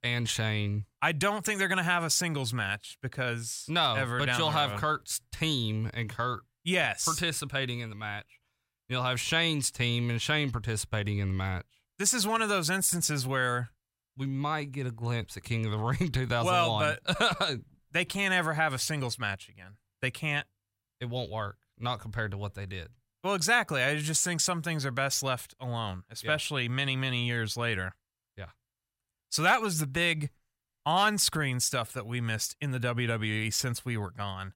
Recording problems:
none

